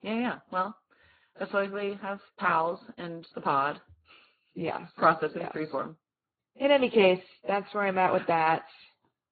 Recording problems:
garbled, watery; badly
high frequencies cut off; severe; nothing above 4.5 kHz

